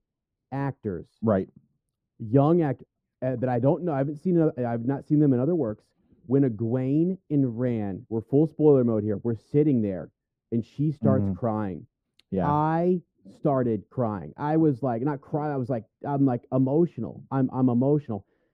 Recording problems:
muffled; very; fading above 1 kHz

